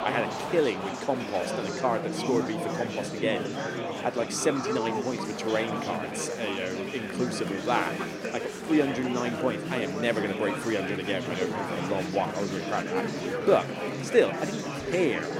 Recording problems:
murmuring crowd; loud; throughout; 3 dB below the speech

